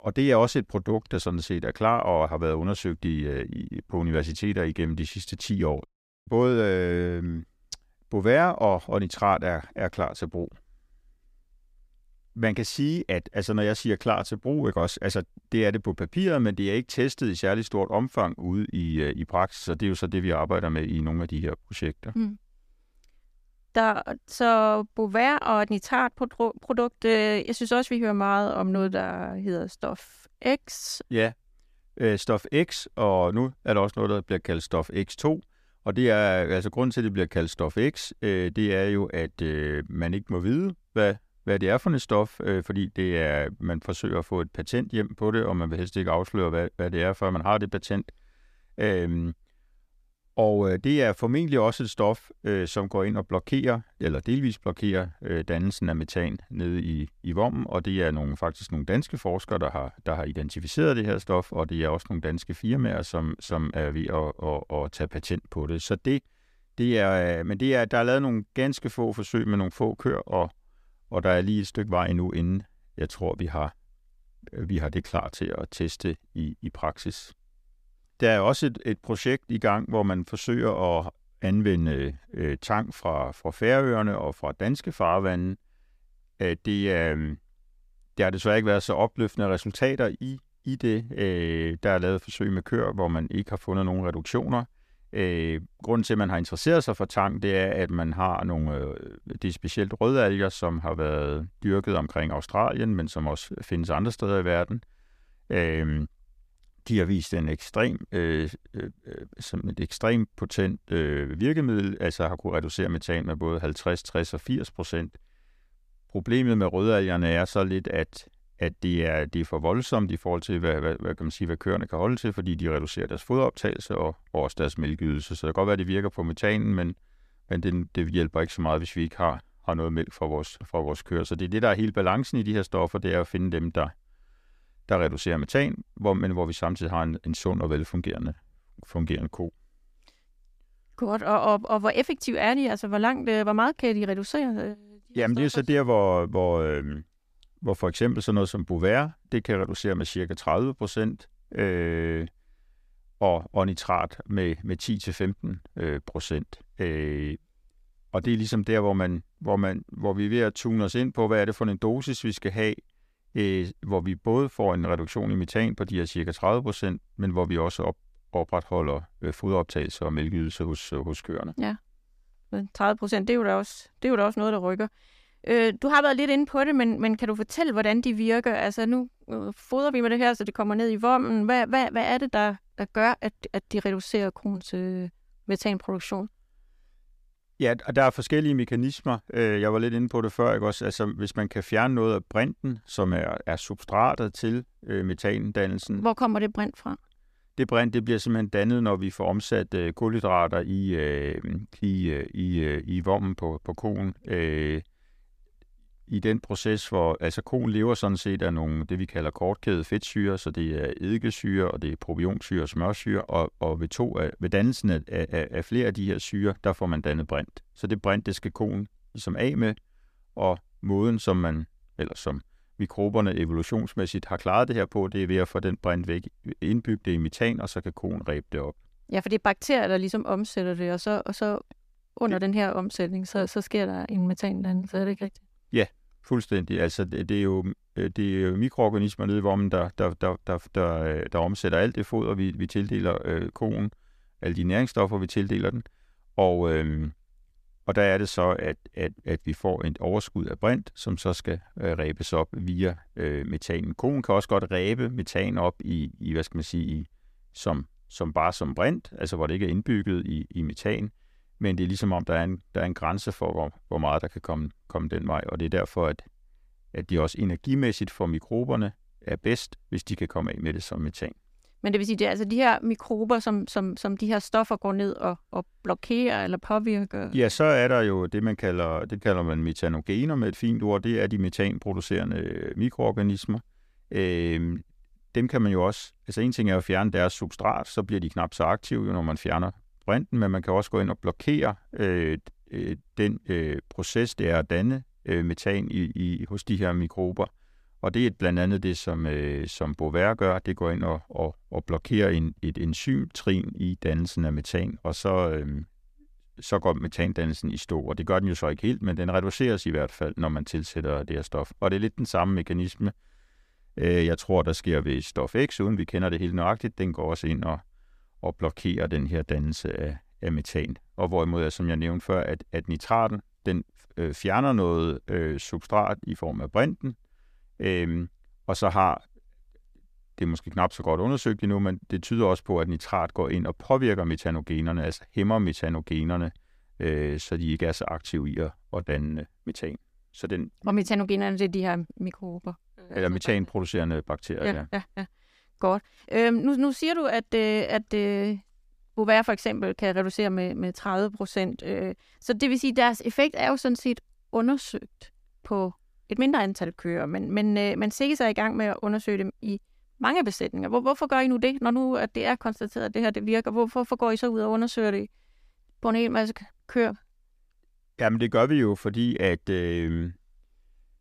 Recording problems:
none

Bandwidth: 14.5 kHz